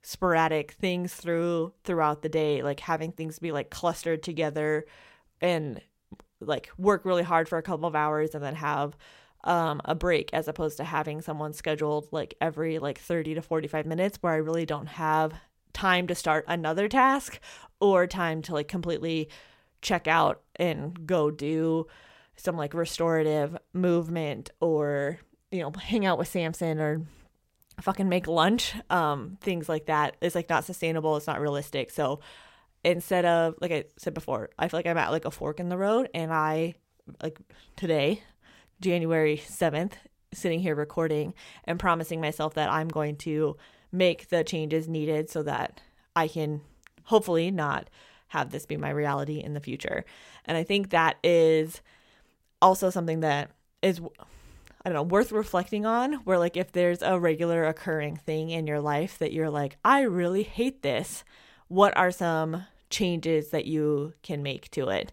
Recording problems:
none

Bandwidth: 16 kHz